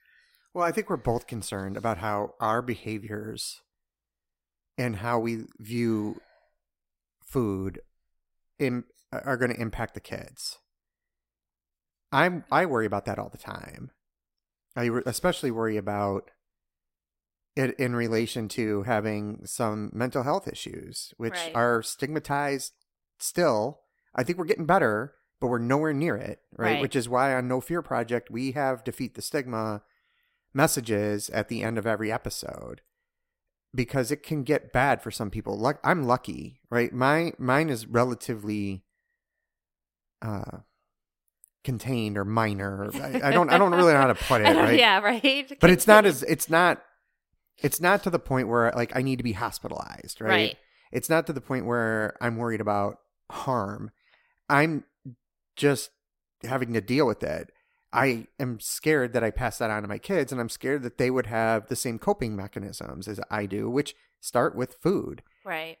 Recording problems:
none

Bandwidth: 16 kHz